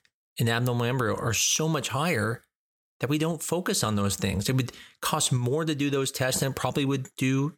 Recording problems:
none

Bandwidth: 18.5 kHz